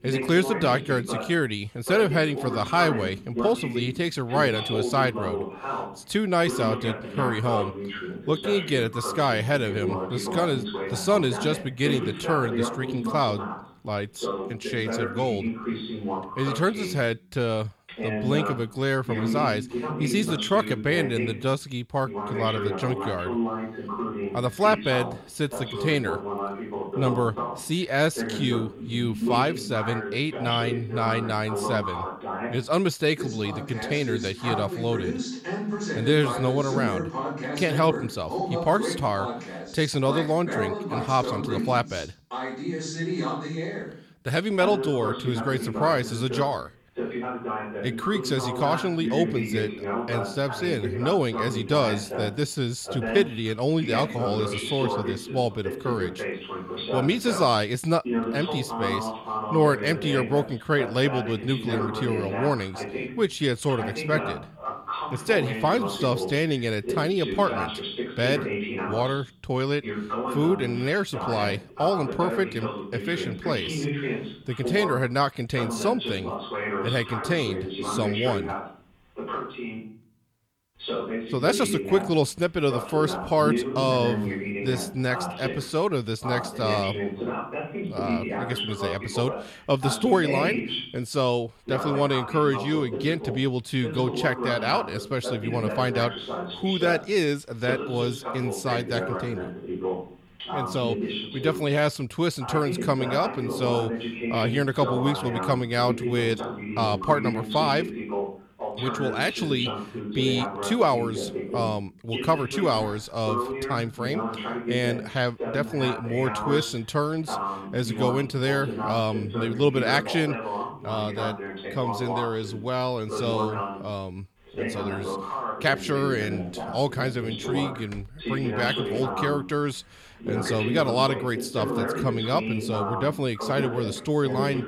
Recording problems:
voice in the background; loud; throughout; 5 dB below the speech

